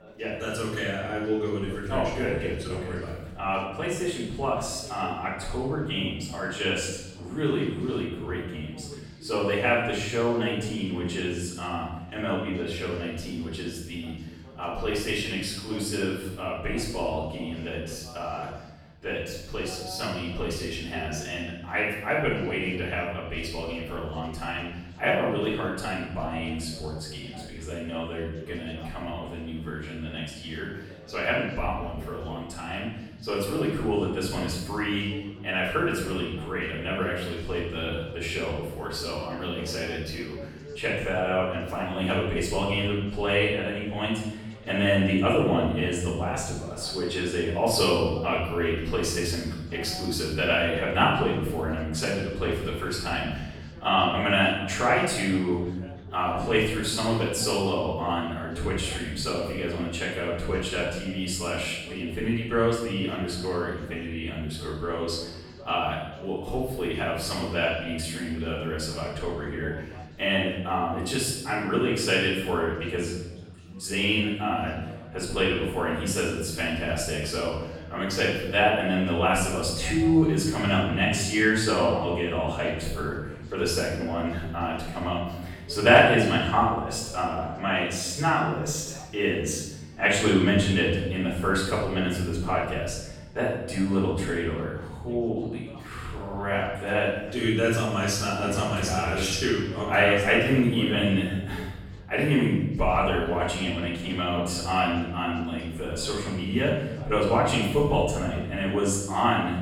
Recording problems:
off-mic speech; far
room echo; noticeable; dies away in 1.1 s
chatter from many people; faint; throughout; 20 dB below the speech

